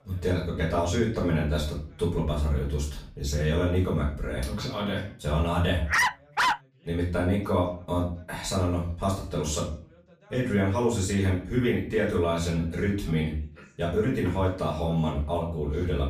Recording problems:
off-mic speech; far
room echo; slight; dies away in 0.4 s
voice in the background; faint; throughout; 30 dB below the speech
dog barking; loud; at 6 s; peak 4 dB above the speech

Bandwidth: 15 kHz